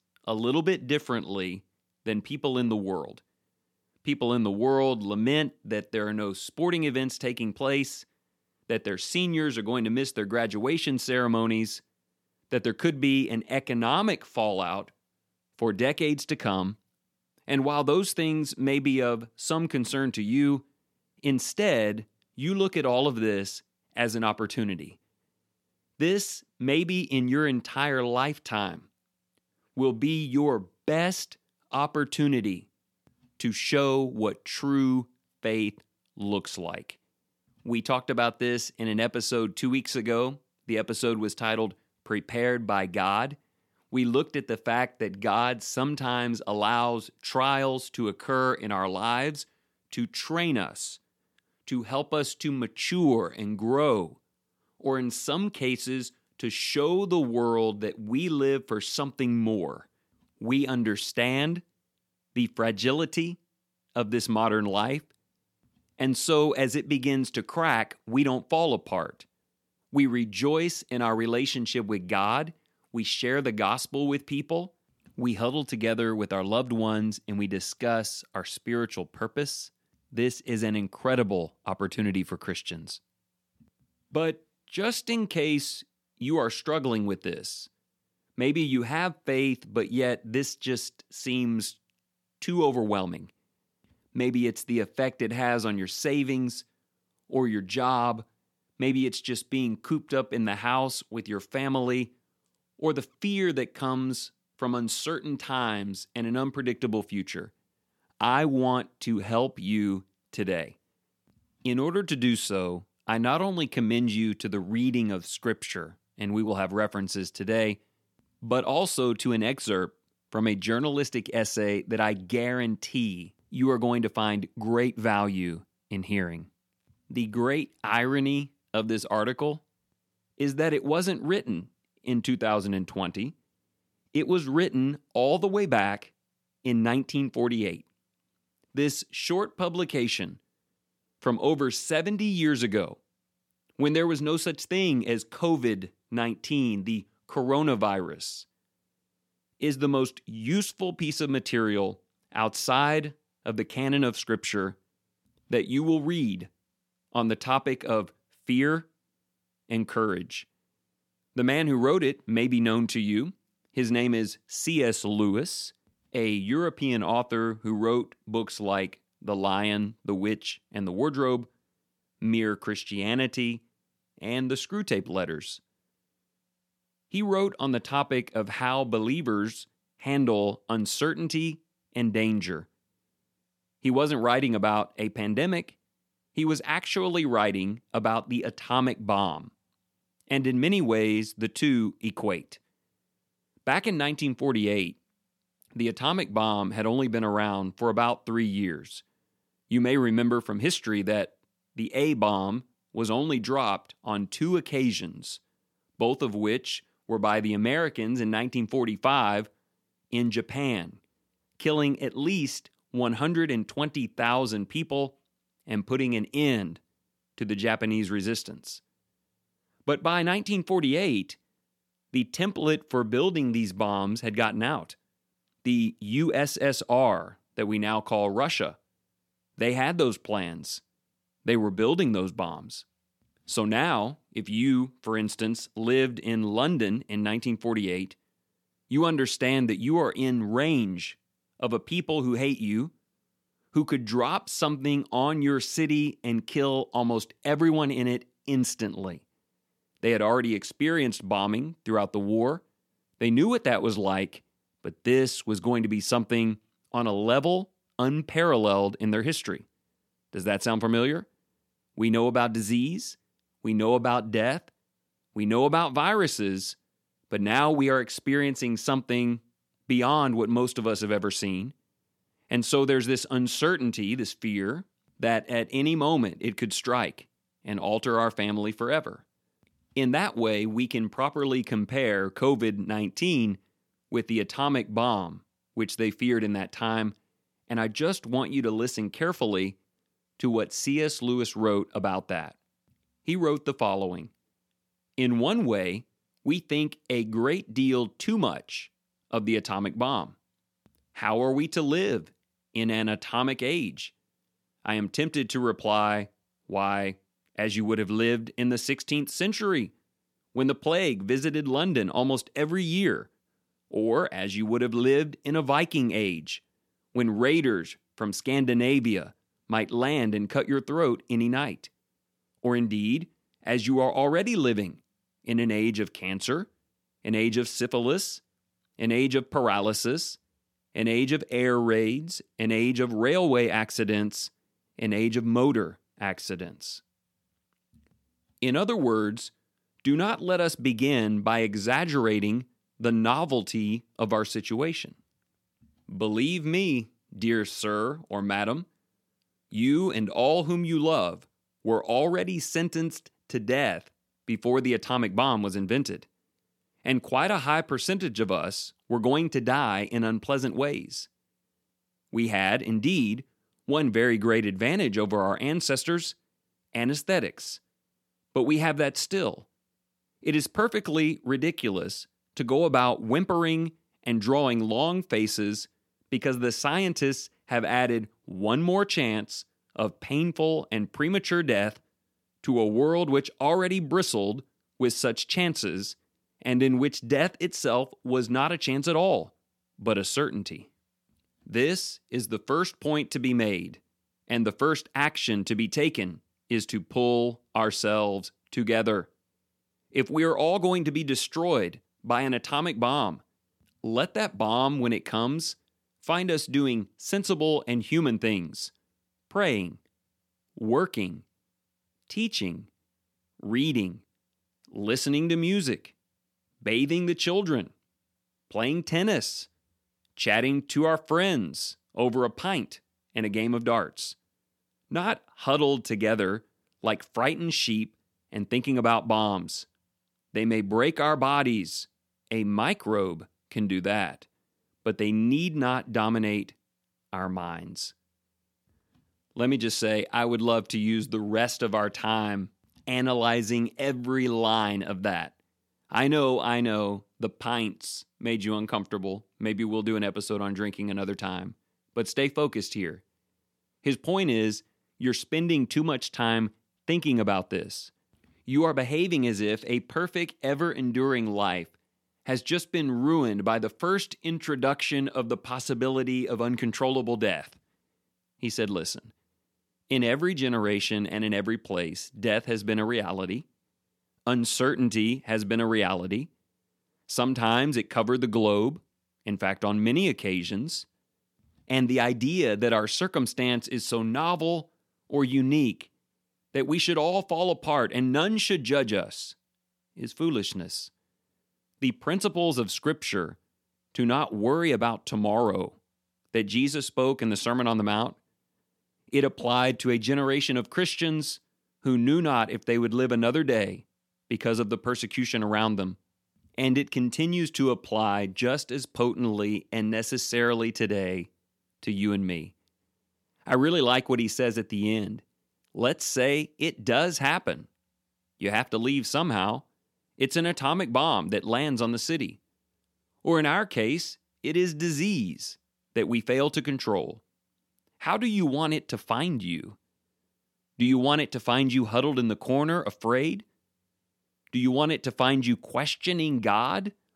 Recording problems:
none

